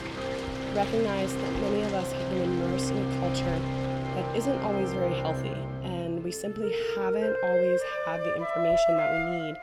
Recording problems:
background music; very loud; throughout; 3 dB above the speech
rain or running water; loud; throughout; 10 dB below the speech

